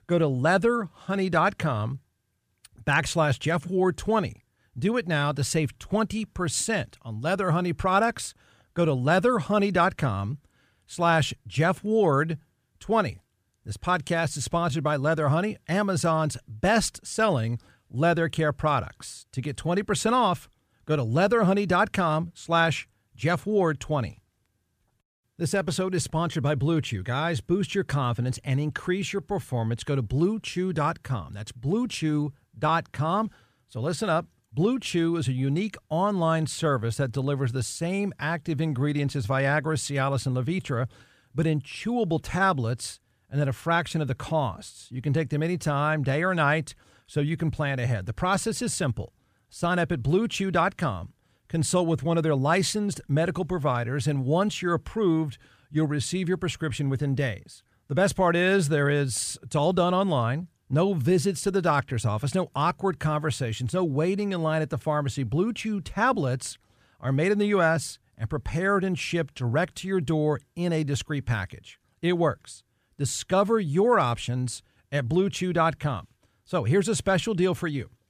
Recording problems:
none

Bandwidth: 15 kHz